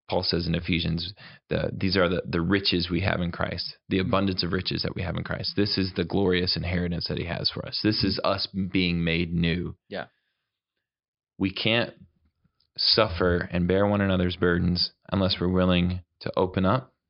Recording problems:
high frequencies cut off; noticeable; nothing above 5.5 kHz

